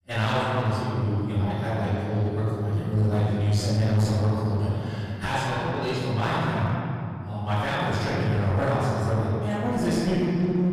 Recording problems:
room echo; strong; dies away in 2.6 s
off-mic speech; far
distortion; slight; 15% of the sound clipped

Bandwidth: 14.5 kHz